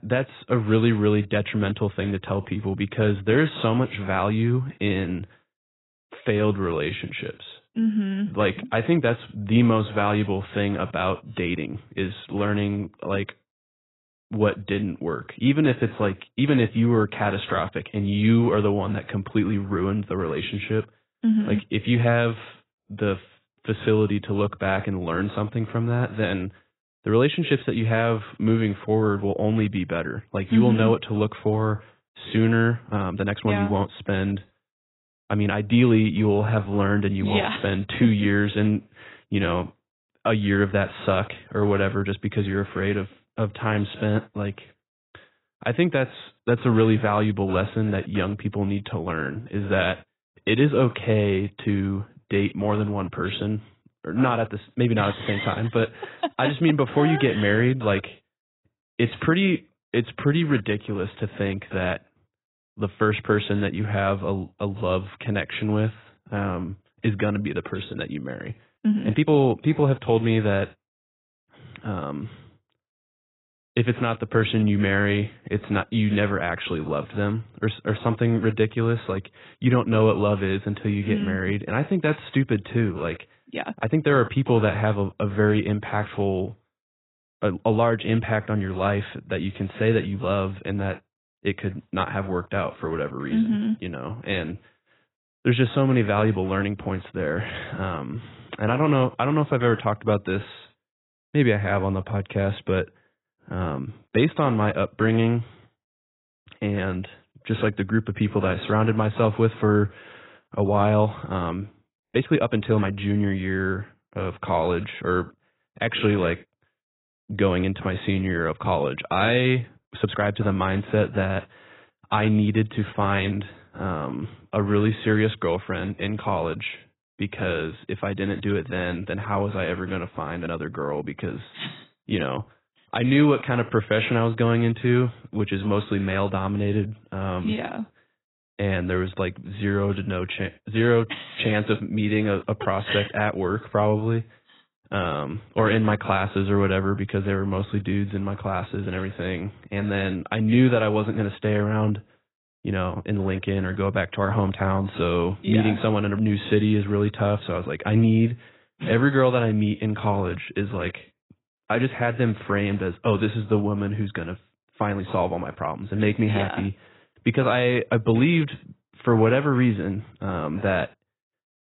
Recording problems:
garbled, watery; badly; nothing above 4 kHz
uneven, jittery; strongly; from 6 s to 2:46

